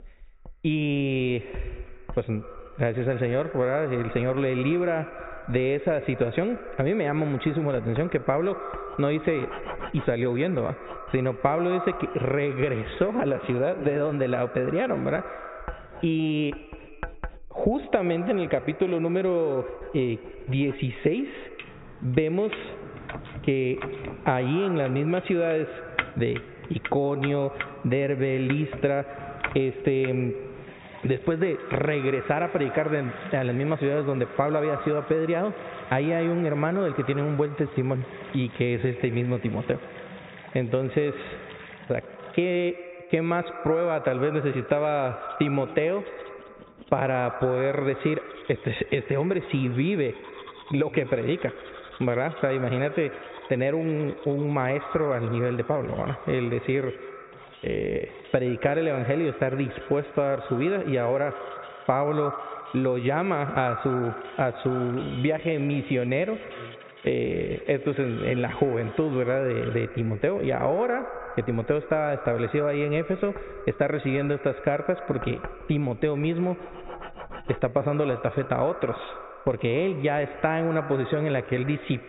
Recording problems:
high frequencies cut off; severe; nothing above 4 kHz
echo of what is said; noticeable; throughout; 120 ms later, 15 dB below the speech
muffled; very slightly; fading above 2 kHz
squashed, flat; somewhat, background pumping
household noises; noticeable; throughout; 15 dB below the speech

